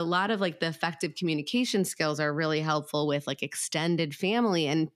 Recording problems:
abrupt cut into speech; at the start

